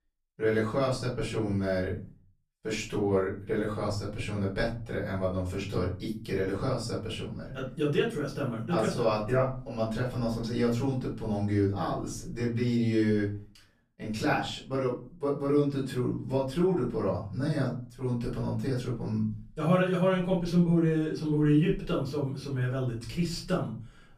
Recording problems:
off-mic speech; far
room echo; slight; dies away in 0.4 s

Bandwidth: 14.5 kHz